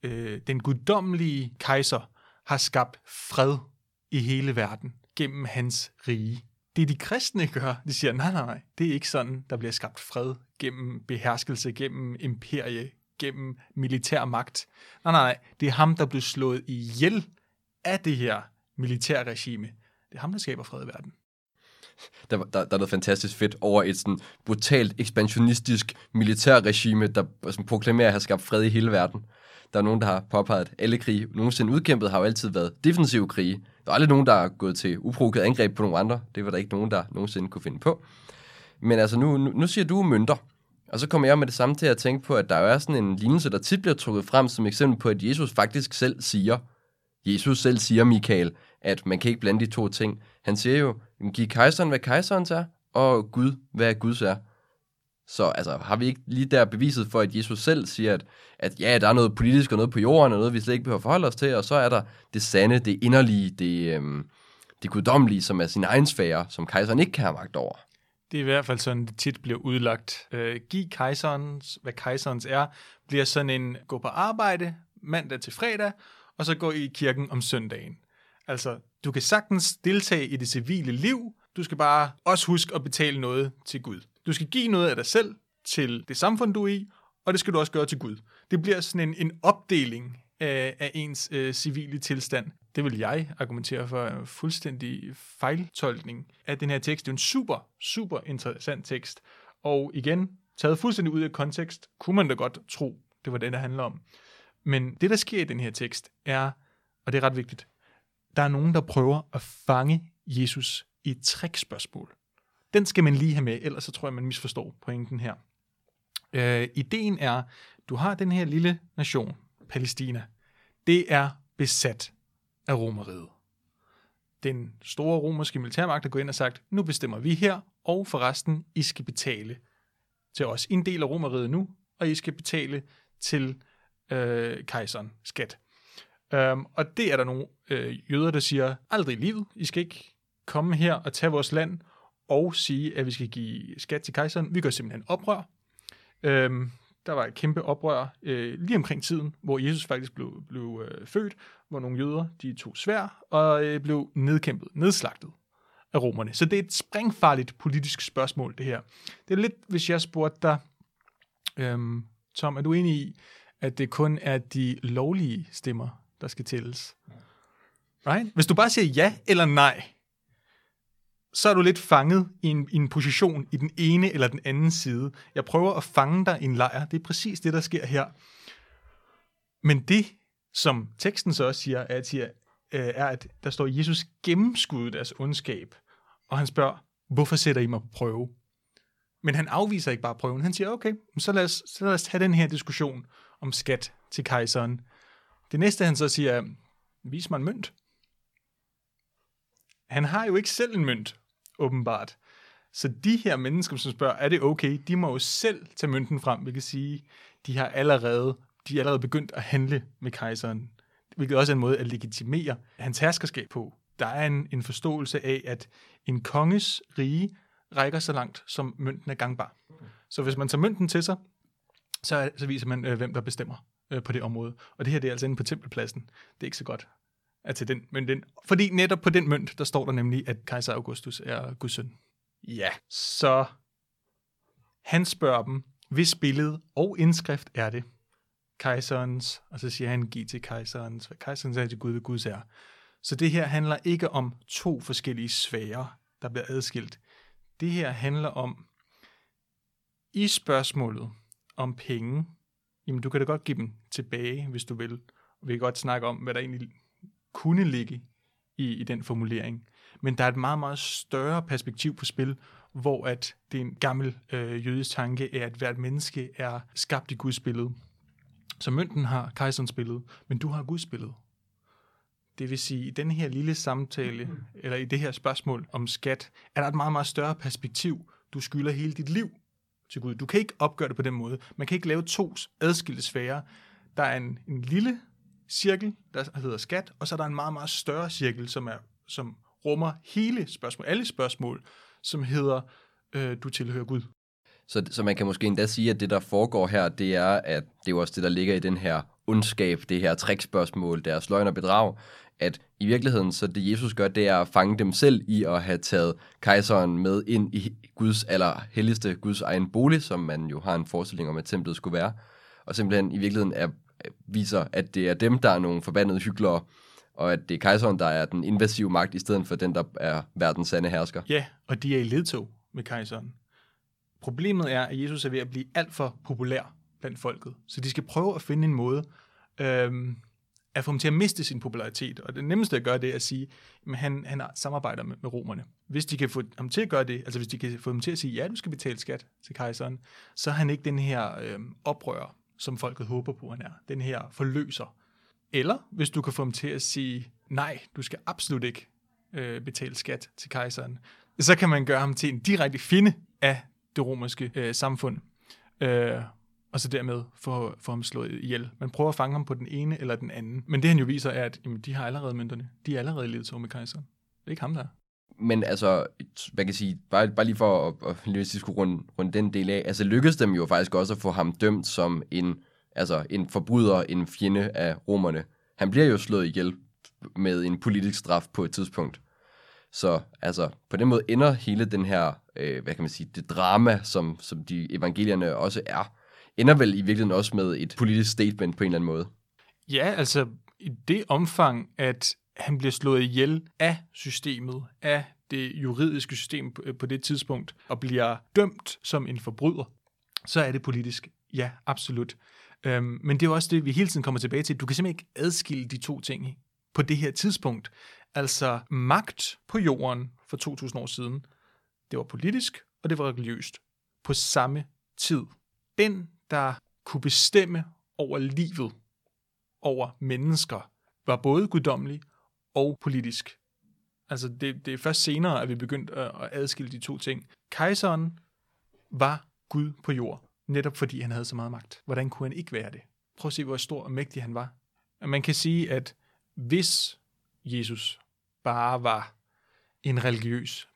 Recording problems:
none

